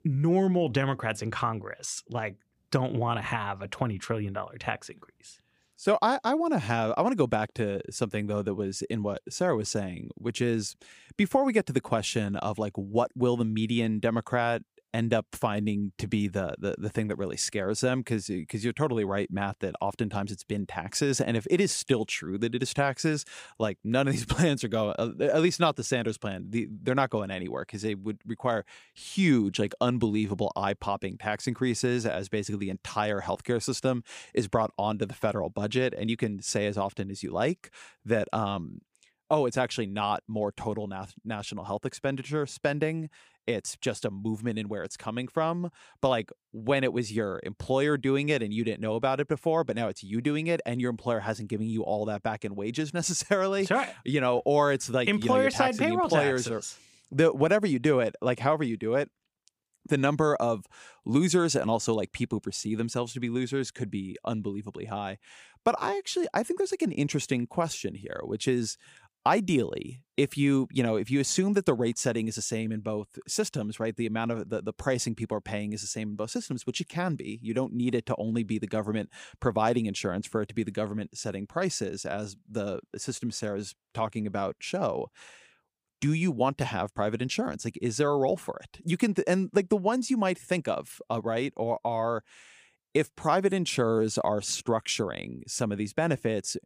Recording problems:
none

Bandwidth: 15 kHz